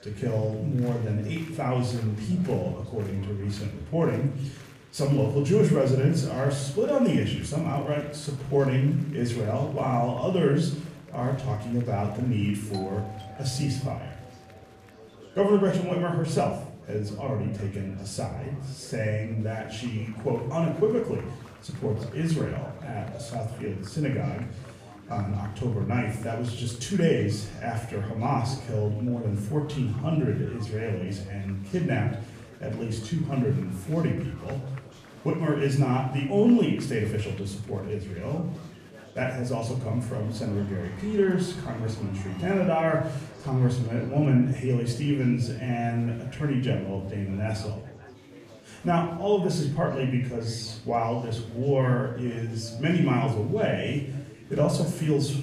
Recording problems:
off-mic speech; far
room echo; noticeable; dies away in 0.6 s
chatter from many people; faint; throughout; 20 dB below the speech
doorbell; faint; from 13 to 14 s; peak 15 dB below the speech

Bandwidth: 14.5 kHz